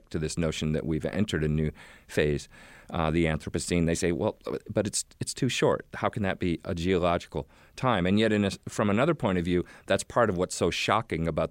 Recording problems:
none

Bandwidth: 16 kHz